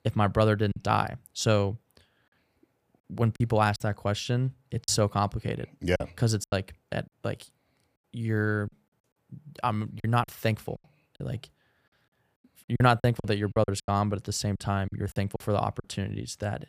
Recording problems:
choppy; very; 9% of the speech affected

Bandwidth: 15 kHz